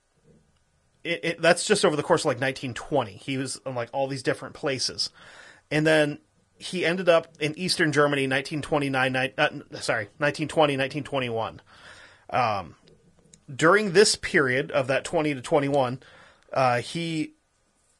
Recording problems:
garbled, watery; slightly; nothing above 10.5 kHz

